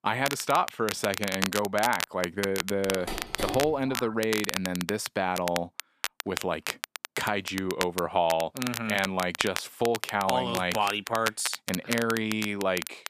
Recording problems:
crackle, like an old record; loud; 6 dB below the speech
phone ringing; noticeable; from 3 to 4 s; peak 6 dB below the speech

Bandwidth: 14.5 kHz